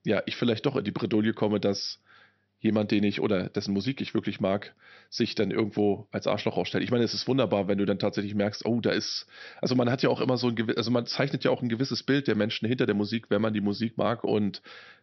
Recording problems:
high frequencies cut off; noticeable; nothing above 6 kHz

